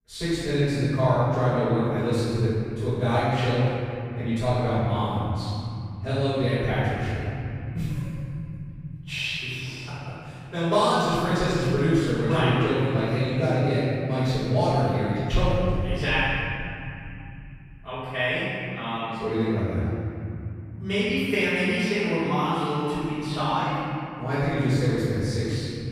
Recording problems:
room echo; strong; dies away in 3 s
off-mic speech; far

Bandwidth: 15 kHz